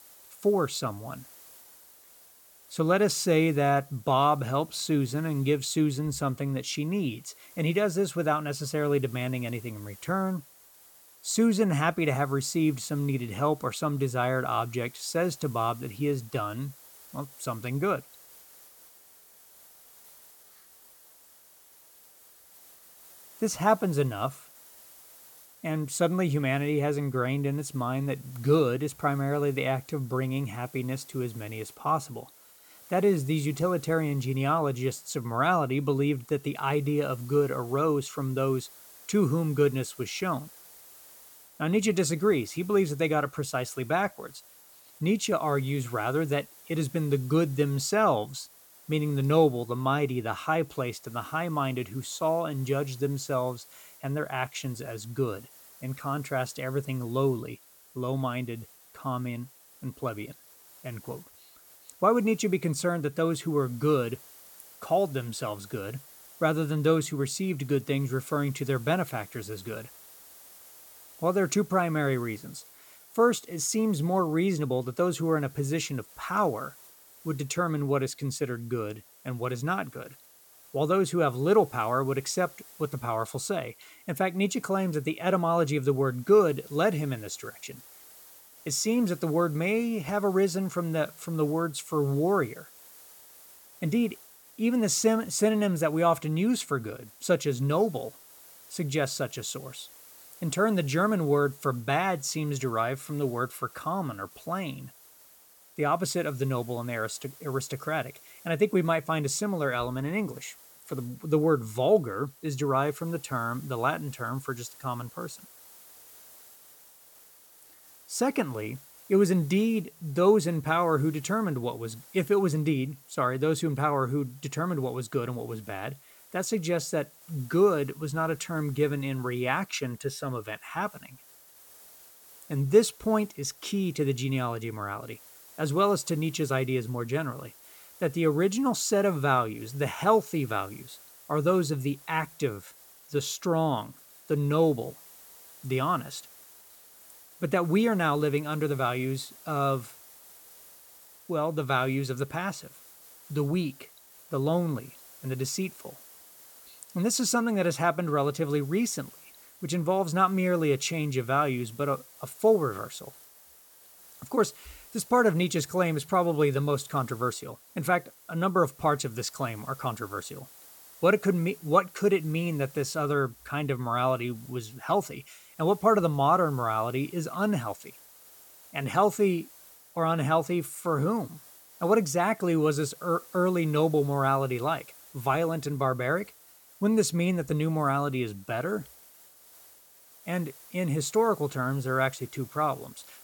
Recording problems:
hiss; faint; throughout; 20 dB below the speech

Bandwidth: 17.5 kHz